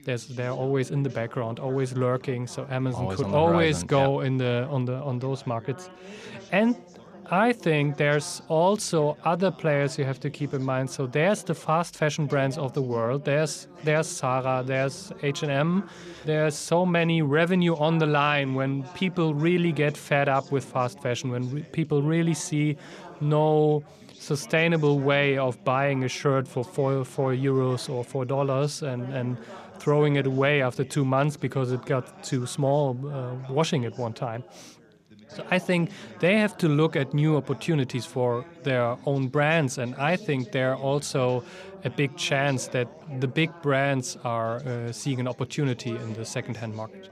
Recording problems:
background chatter; faint; throughout; 4 voices, 20 dB below the speech

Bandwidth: 14.5 kHz